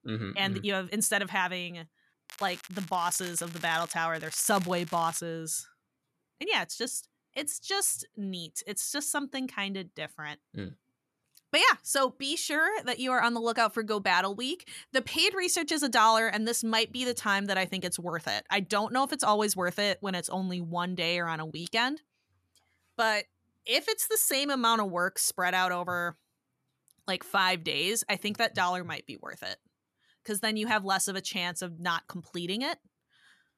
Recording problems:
crackling; noticeable; from 2.5 to 4 s and from 4 to 5 s; 15 dB below the speech

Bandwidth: 13.5 kHz